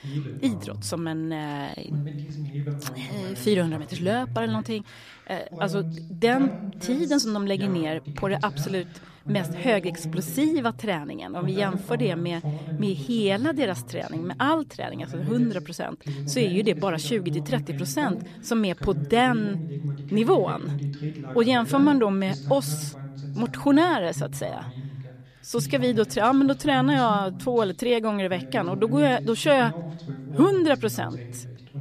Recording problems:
voice in the background; loud; throughout; 9 dB below the speech

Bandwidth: 14.5 kHz